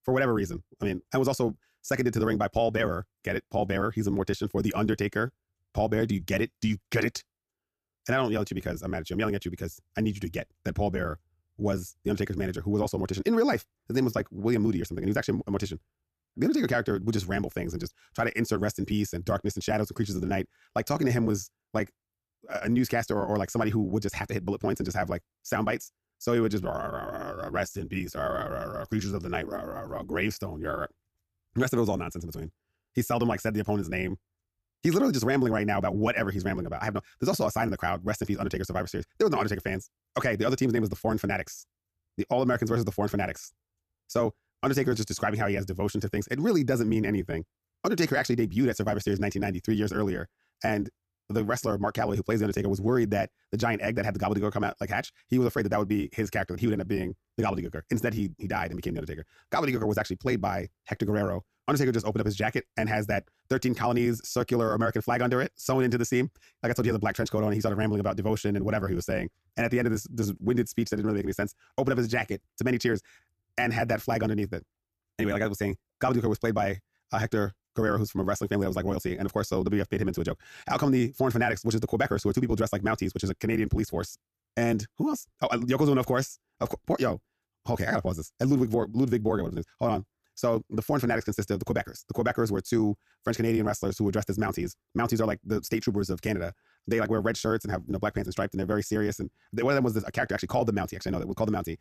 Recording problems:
wrong speed, natural pitch; too fast; 1.6 times normal speed

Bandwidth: 14.5 kHz